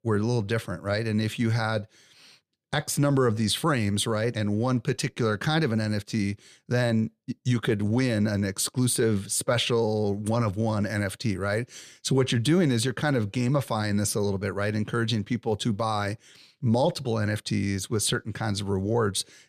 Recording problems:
none

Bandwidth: 14 kHz